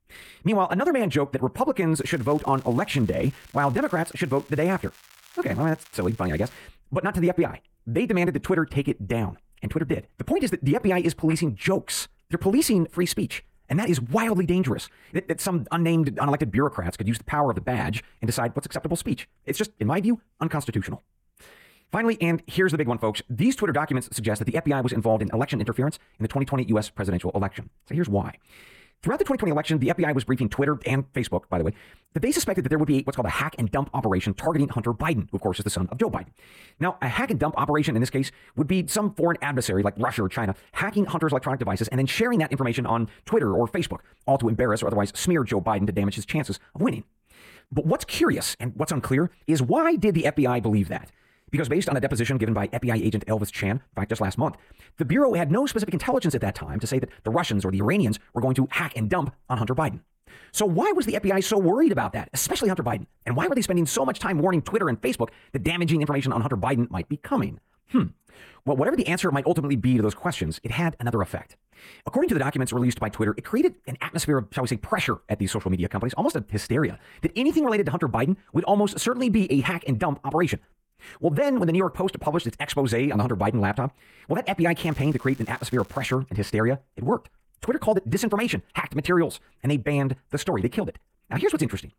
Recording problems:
wrong speed, natural pitch; too fast; 1.7 times normal speed
crackling; faint; from 2 to 6.5 s and from 1:25 to 1:26; 25 dB below the speech

